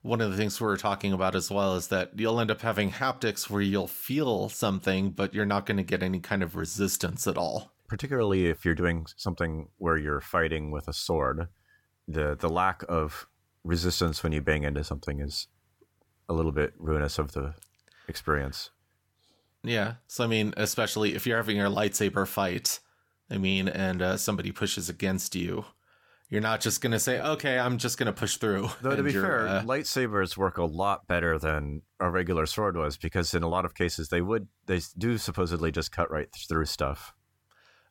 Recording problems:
none

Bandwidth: 17 kHz